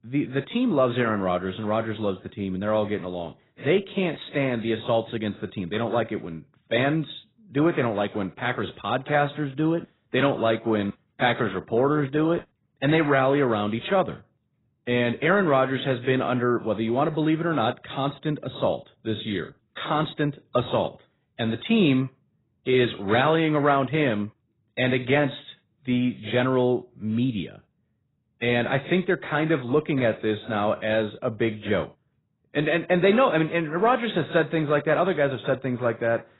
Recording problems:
garbled, watery; badly; nothing above 4 kHz

